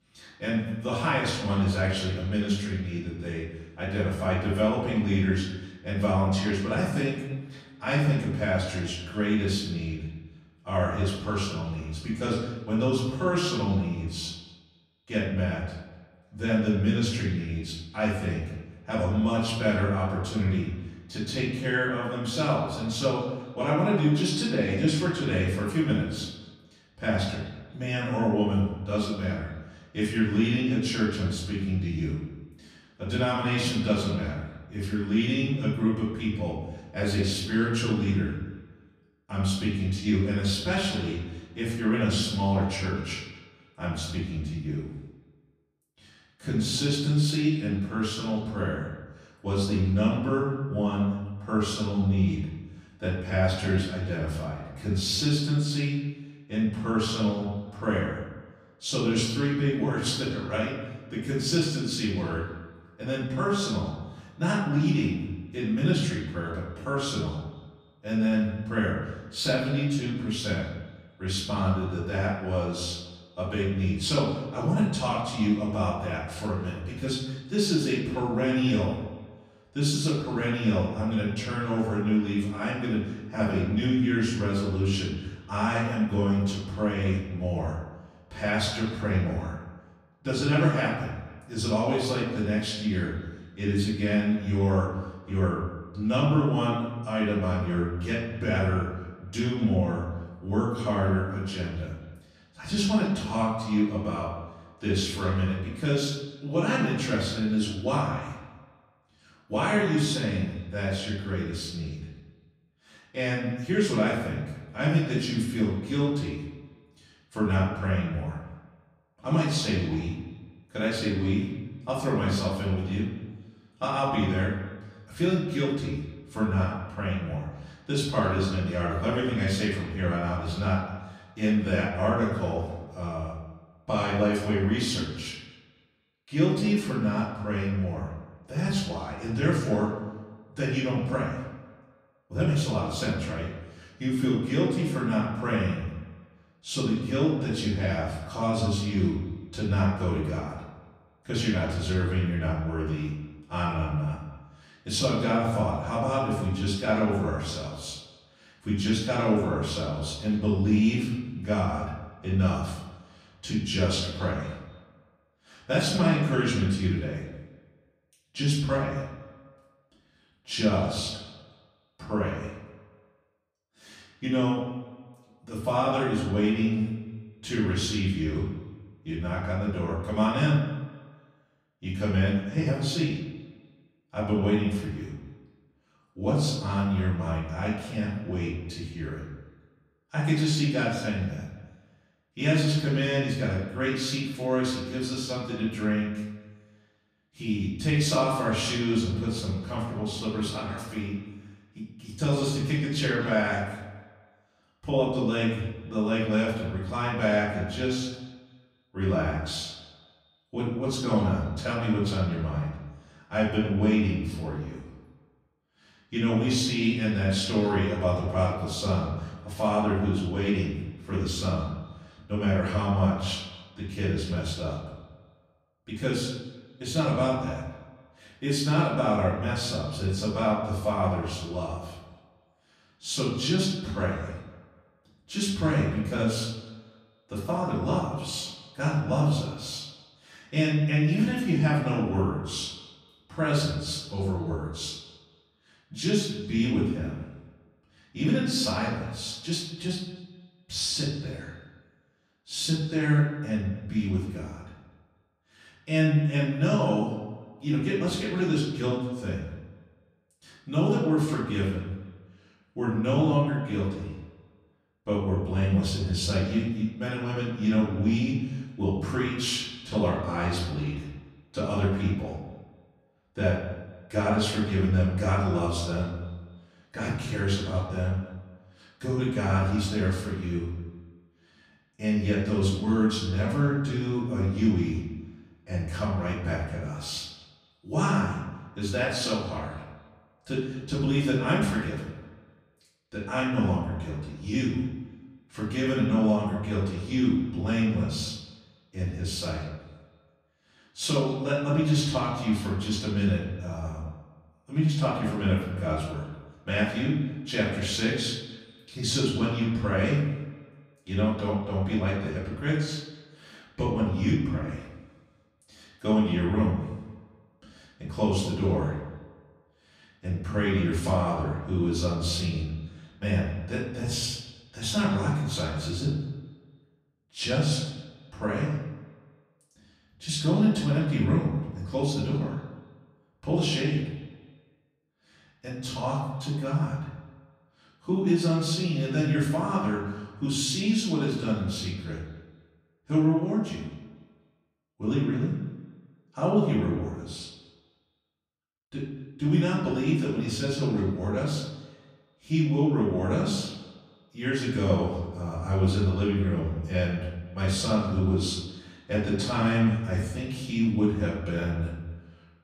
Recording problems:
off-mic speech; far
room echo; noticeable; dies away in 0.9 s
echo of what is said; faint; throughout; 250 ms later, 20 dB below the speech

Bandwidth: 14.5 kHz